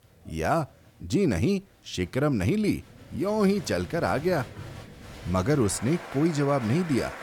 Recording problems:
crowd noise; noticeable; throughout; 15 dB below the speech

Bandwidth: 18.5 kHz